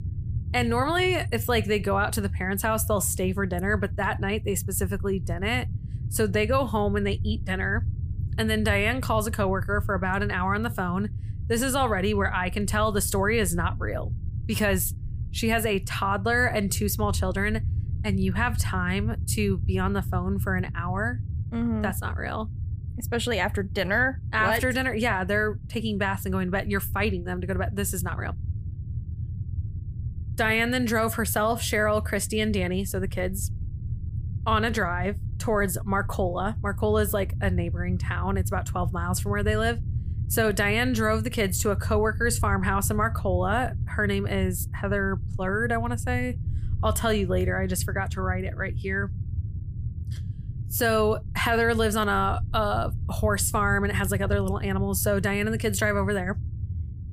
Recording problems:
low rumble; faint; throughout; 20 dB below the speech

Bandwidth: 15 kHz